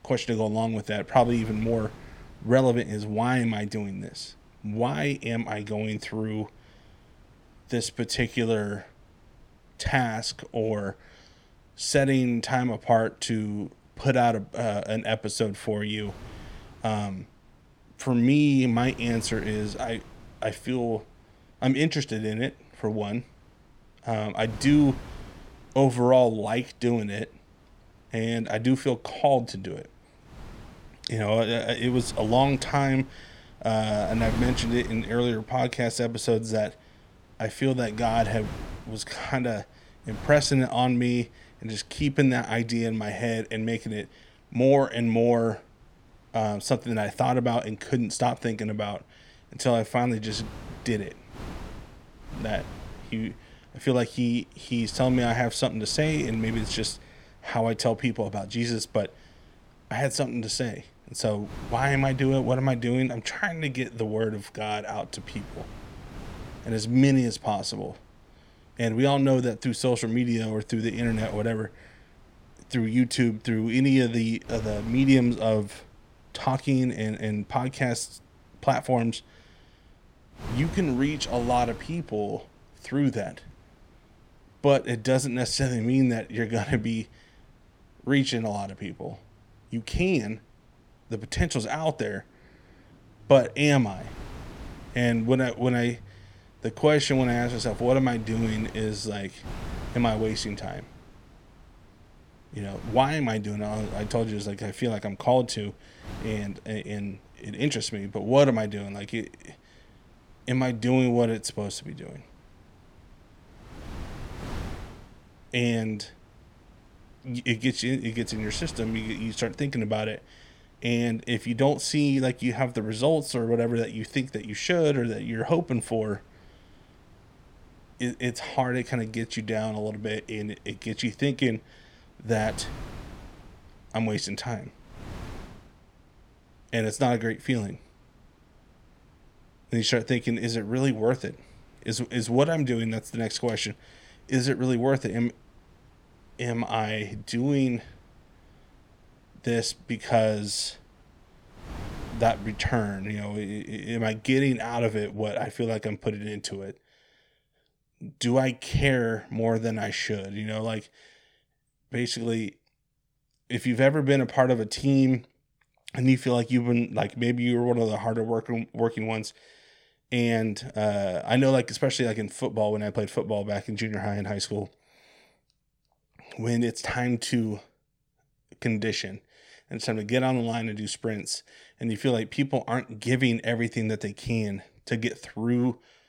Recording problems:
wind noise on the microphone; occasional gusts; until 2:35; 20 dB below the speech

